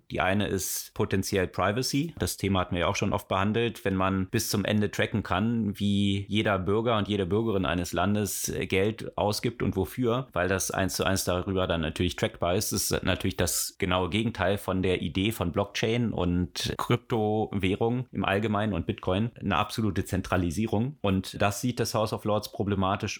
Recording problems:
none

